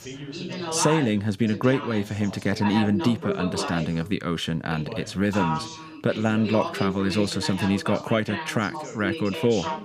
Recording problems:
background chatter; loud; throughout; 2 voices, 7 dB below the speech

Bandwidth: 15 kHz